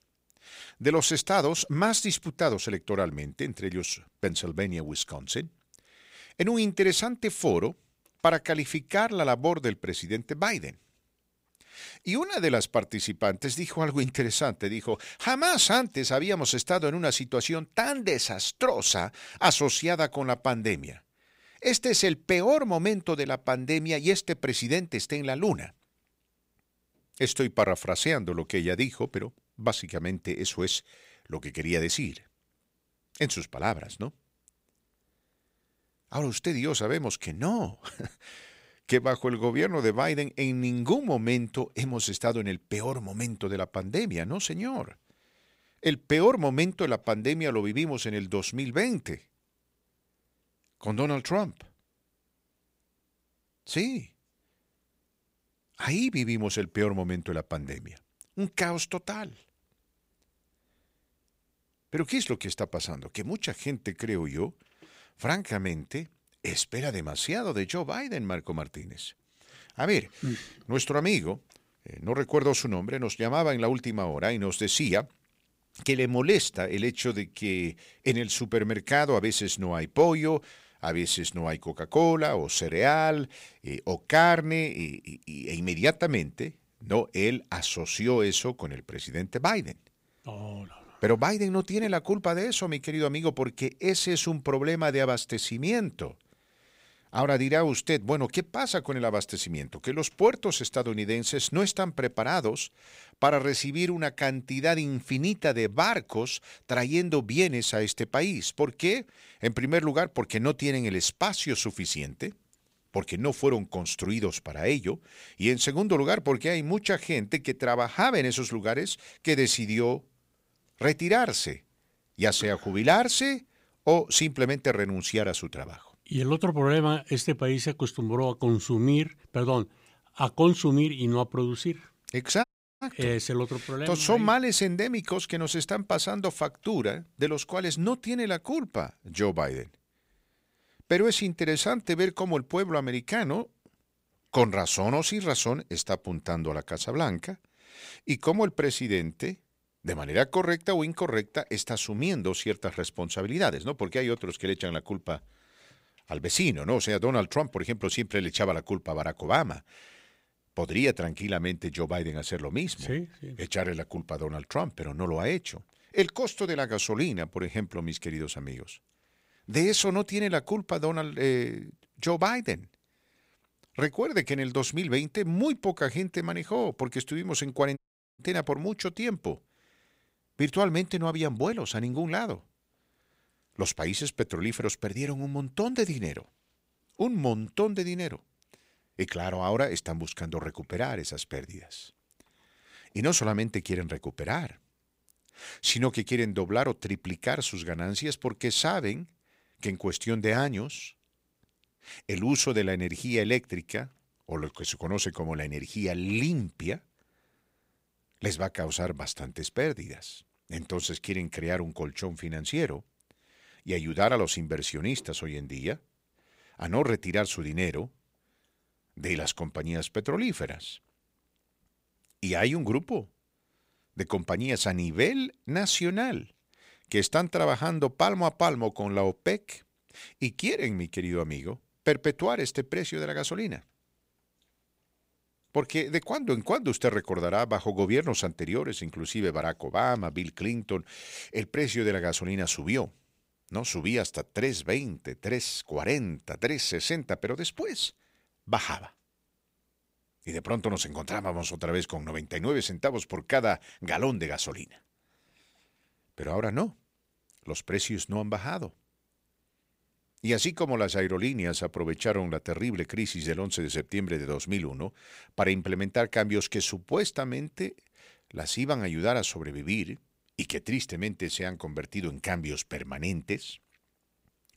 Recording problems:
audio cutting out; at 2:12 and at 2:58

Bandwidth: 15.5 kHz